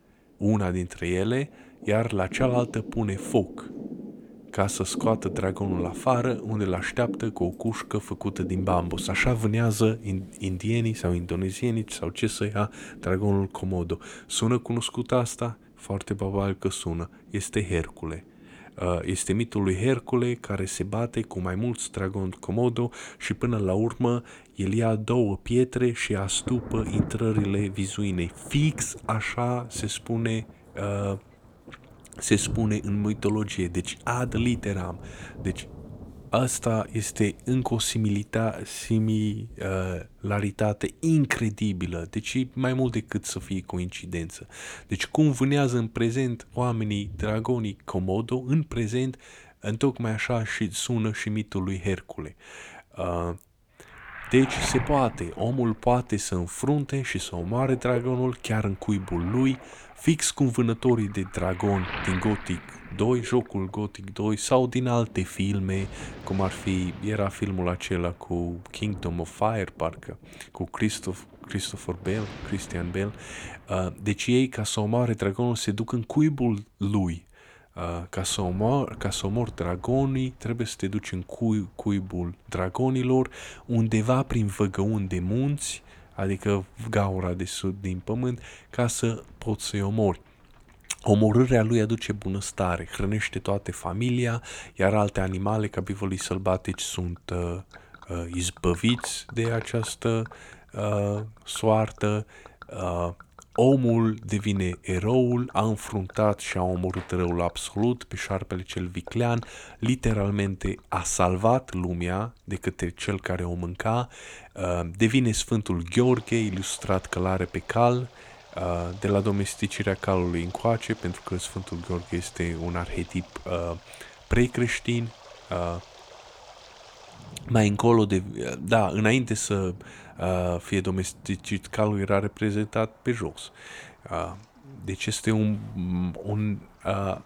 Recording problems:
rain or running water; noticeable; throughout; 15 dB below the speech

